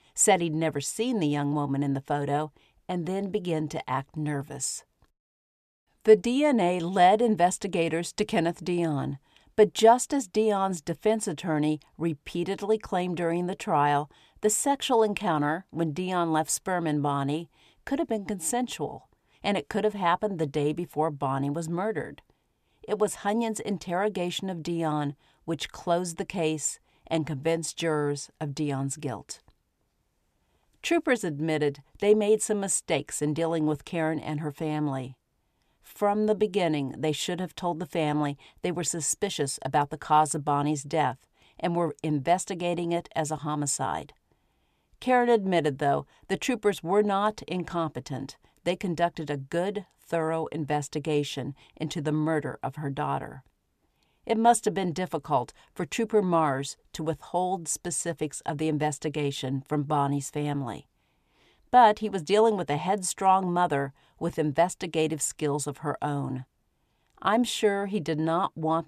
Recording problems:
none

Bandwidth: 14.5 kHz